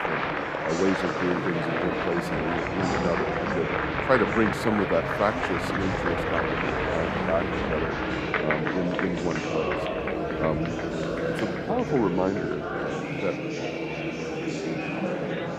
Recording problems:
murmuring crowd; very loud; throughout; 1 dB above the speech
hiss; faint; throughout; 25 dB below the speech

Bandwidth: 14.5 kHz